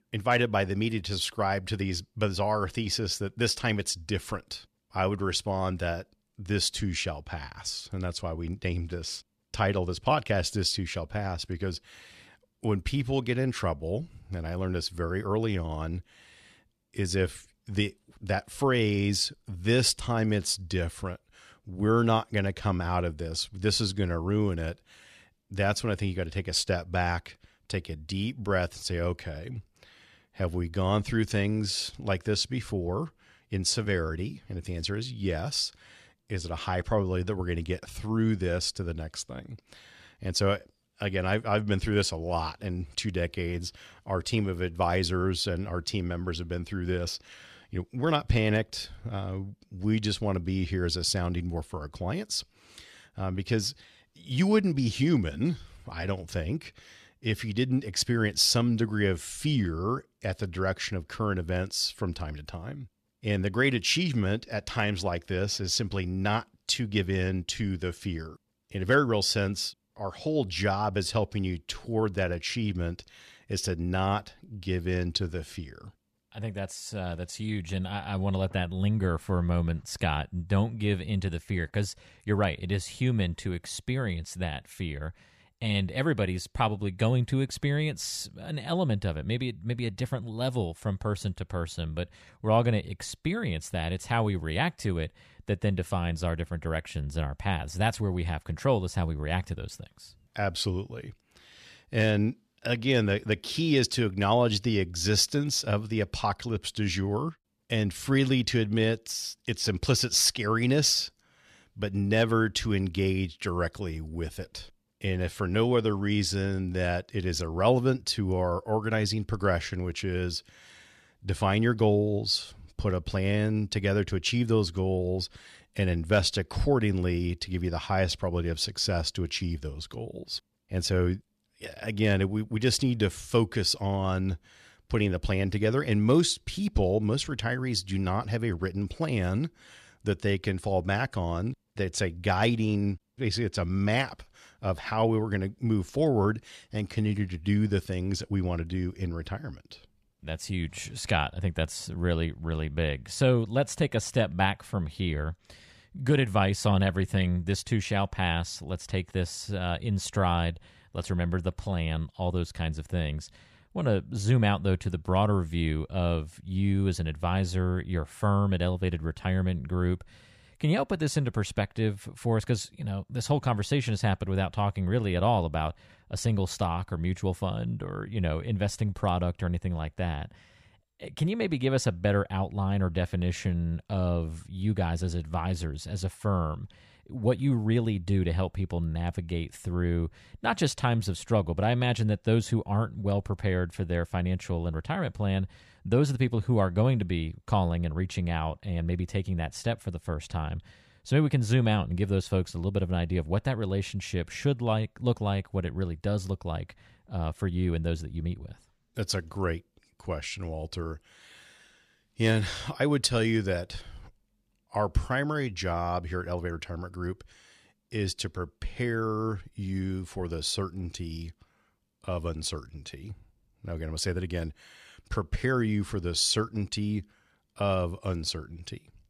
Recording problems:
none

